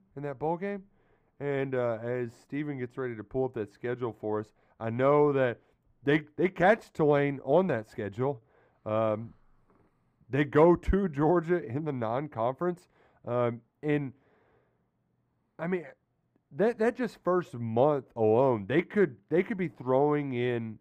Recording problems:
muffled; very; fading above 2.5 kHz

